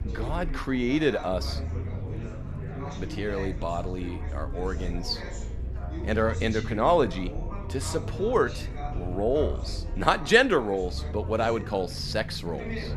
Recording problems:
background chatter; noticeable; throughout; 4 voices, 15 dB below the speech
low rumble; faint; throughout; 25 dB below the speech

